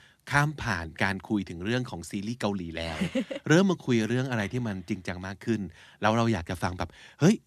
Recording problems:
none

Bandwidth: 14 kHz